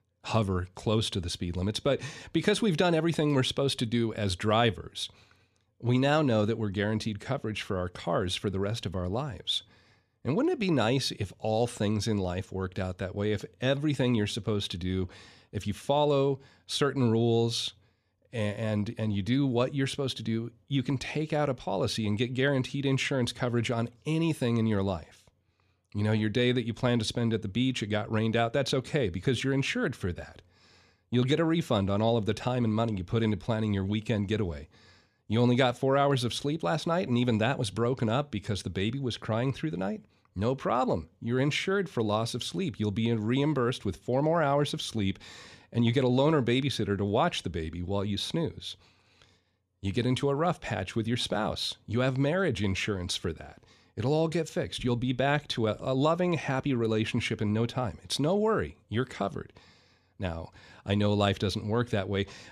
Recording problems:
none

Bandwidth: 14.5 kHz